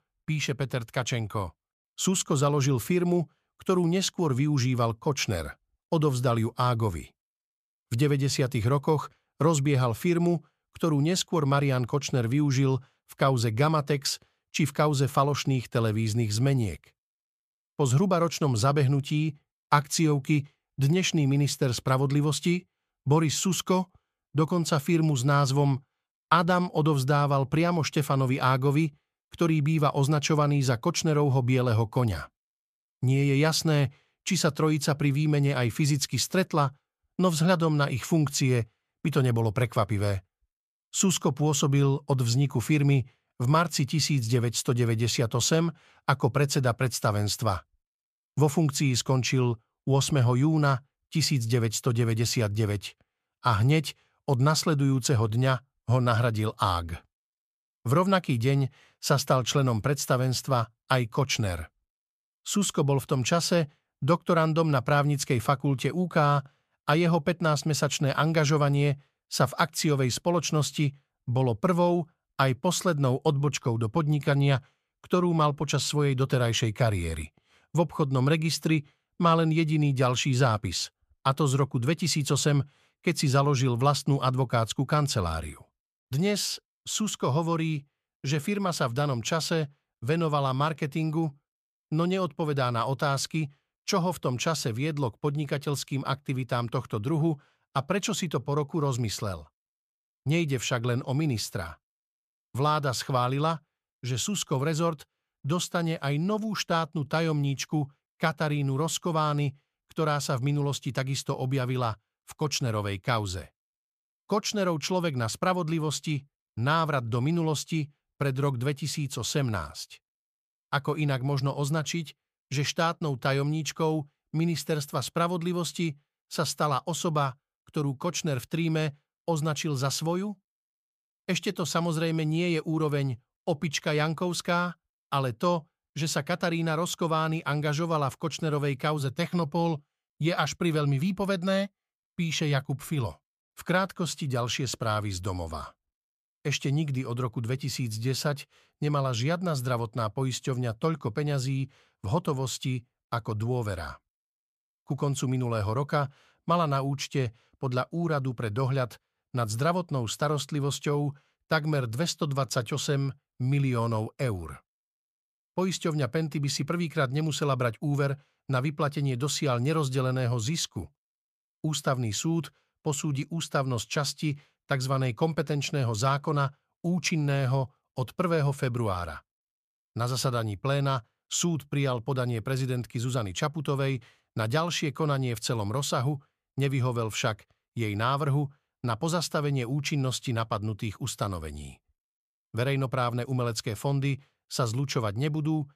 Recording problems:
none

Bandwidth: 14.5 kHz